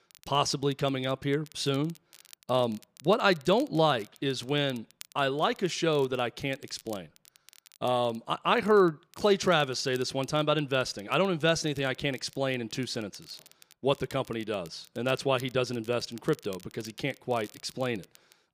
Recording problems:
crackle, like an old record; faint; 25 dB below the speech

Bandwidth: 15 kHz